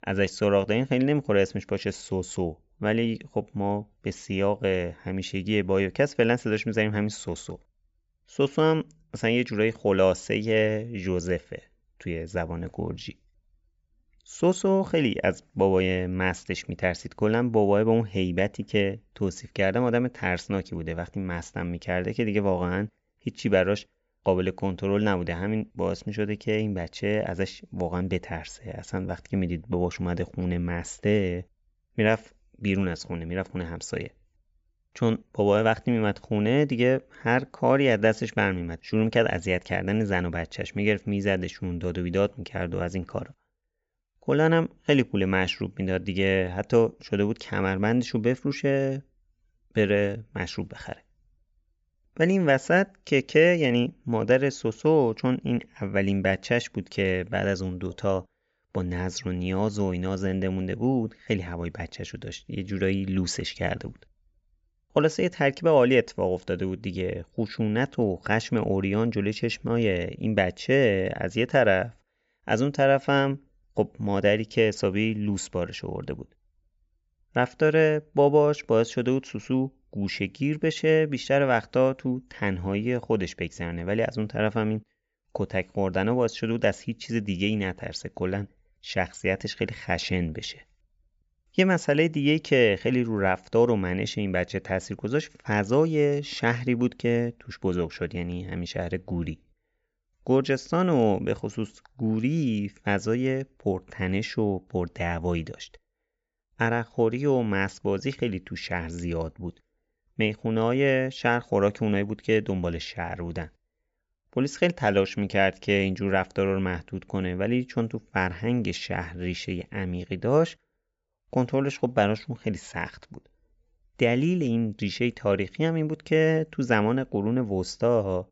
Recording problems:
high frequencies cut off; noticeable; nothing above 8 kHz

